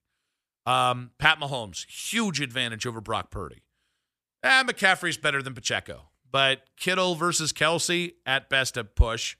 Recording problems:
none

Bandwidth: 15 kHz